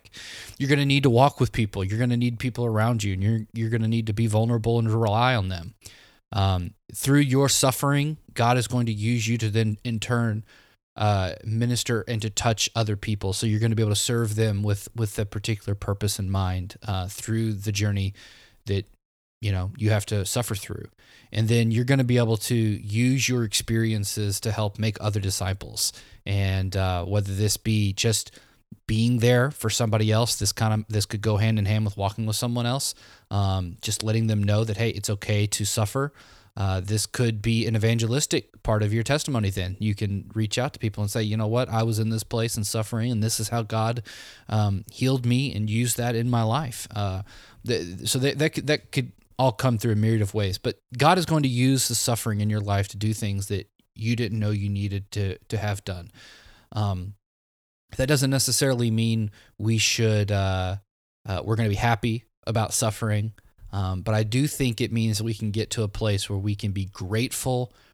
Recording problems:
none

